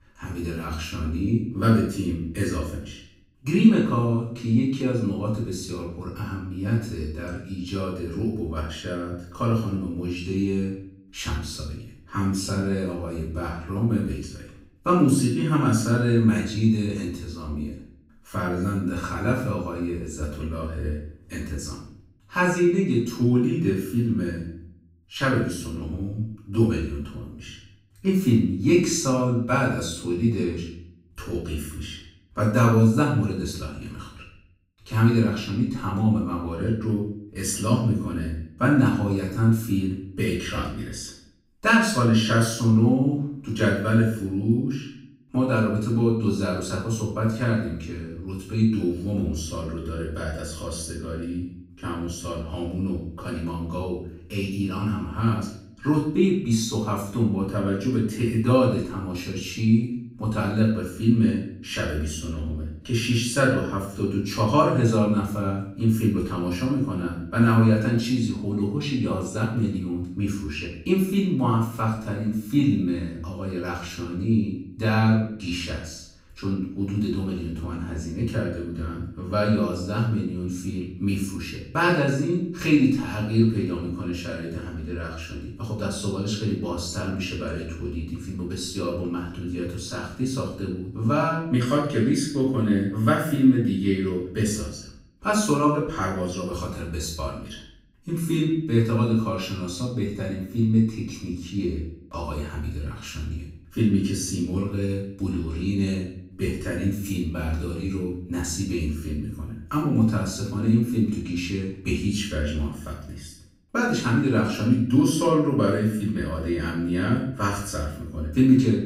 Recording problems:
off-mic speech; far
room echo; noticeable; dies away in 0.6 s

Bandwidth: 15.5 kHz